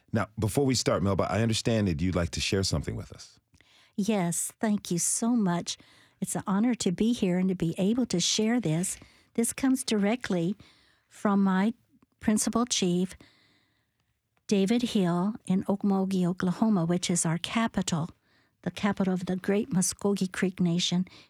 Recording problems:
none

